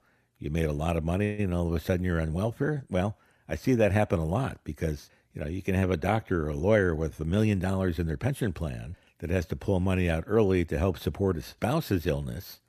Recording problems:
none

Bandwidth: 14.5 kHz